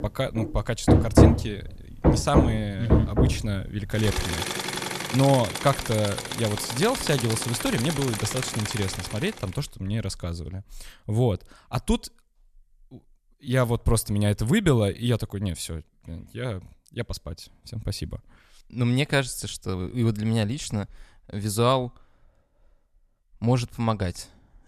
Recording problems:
machinery noise; very loud; until 9 s; 1 dB above the speech

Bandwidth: 14 kHz